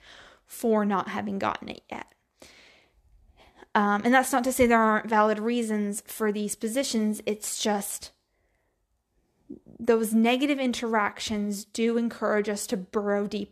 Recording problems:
none

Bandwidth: 13.5 kHz